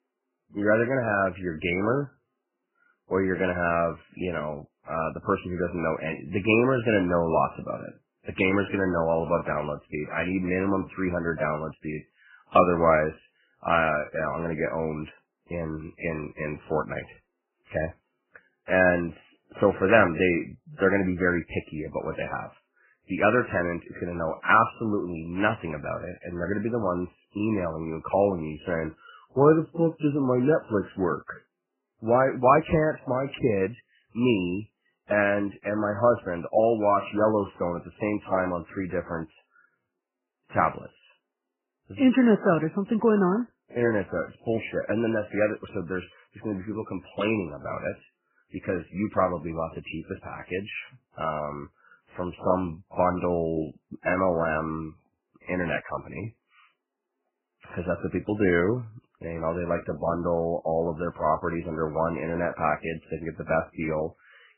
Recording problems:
garbled, watery; badly; nothing above 2.5 kHz

